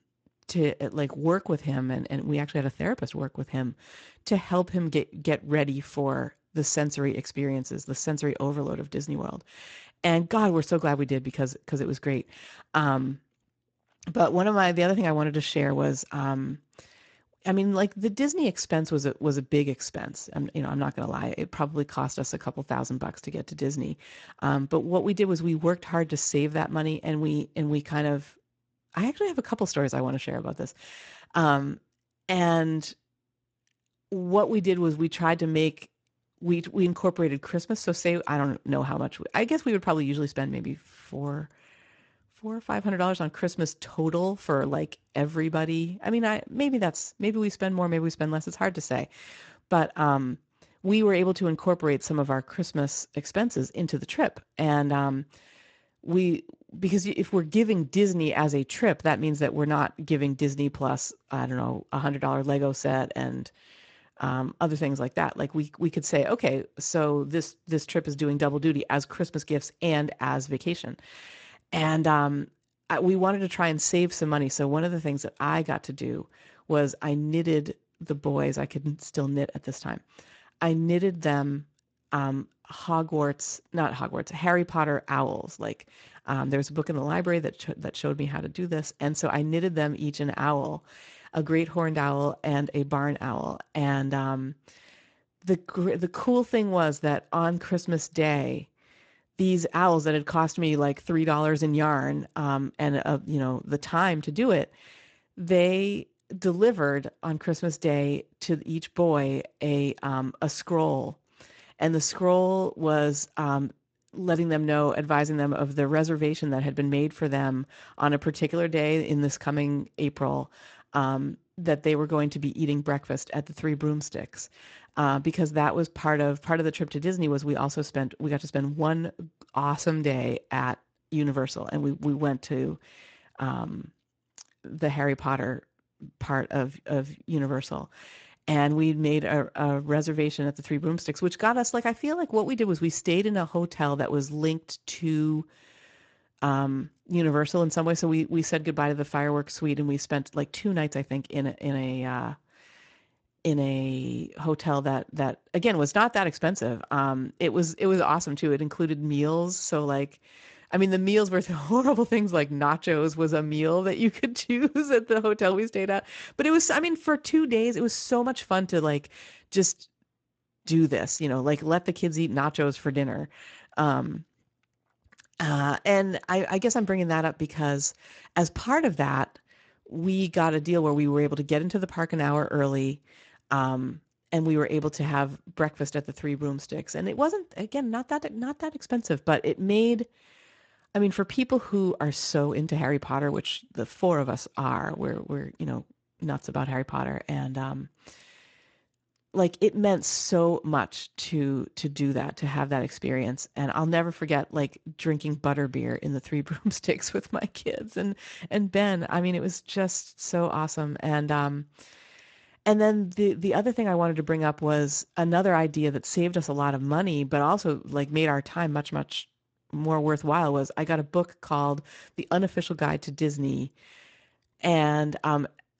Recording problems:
garbled, watery; slightly; nothing above 7.5 kHz

